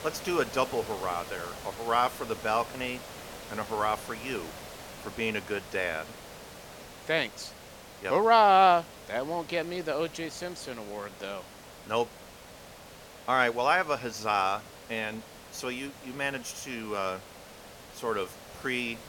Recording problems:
hiss; noticeable; throughout; 15 dB below the speech

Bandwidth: 17 kHz